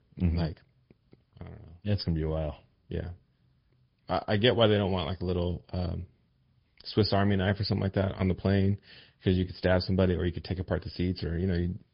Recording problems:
high frequencies cut off; noticeable; nothing above 5 kHz
garbled, watery; slightly

